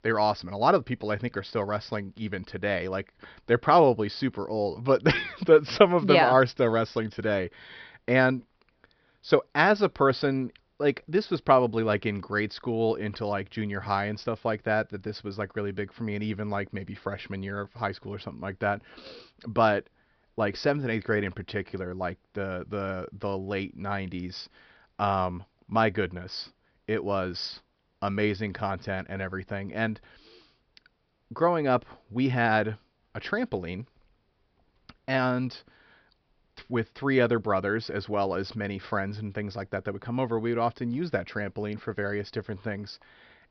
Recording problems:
high frequencies cut off; noticeable; nothing above 5.5 kHz

